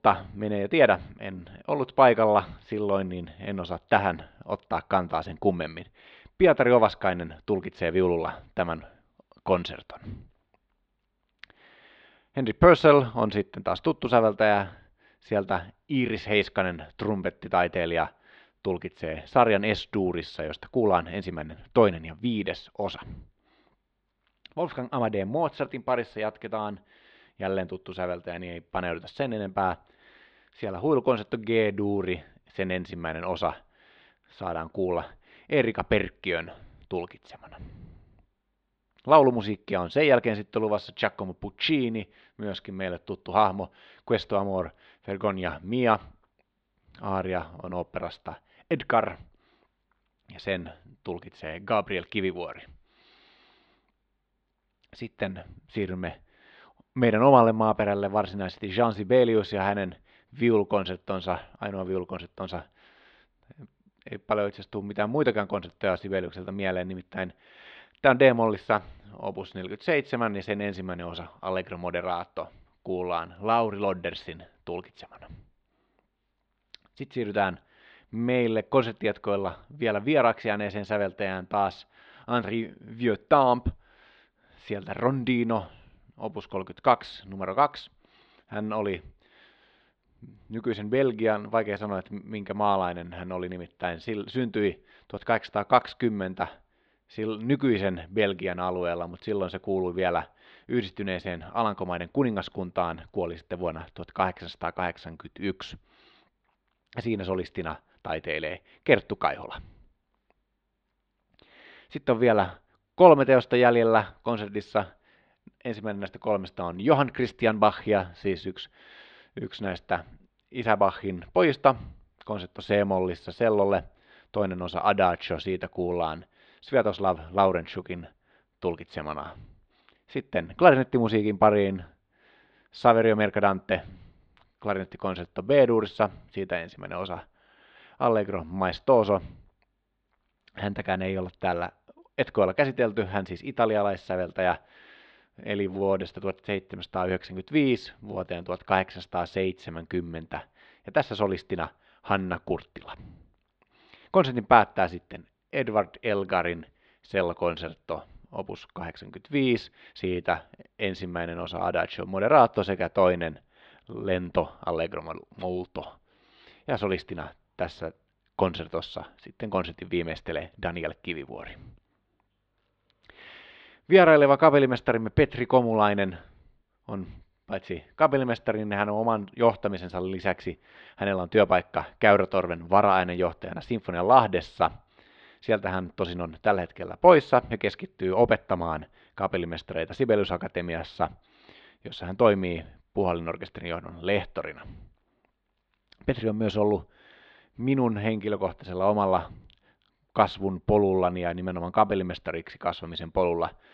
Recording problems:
muffled; slightly; fading above 4 kHz

